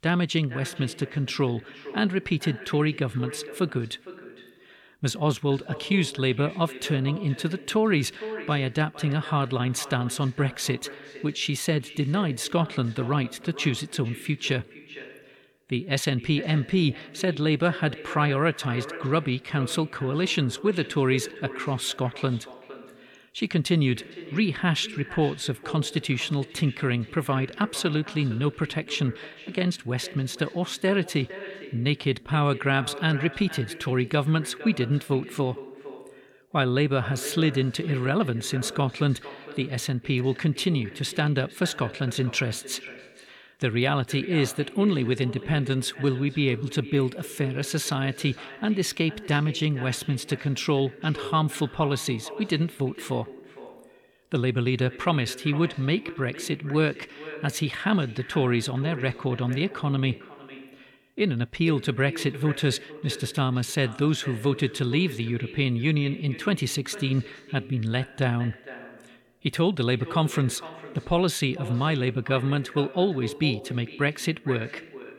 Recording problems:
echo of what is said; noticeable; throughout; 460 ms later, 15 dB below the speech

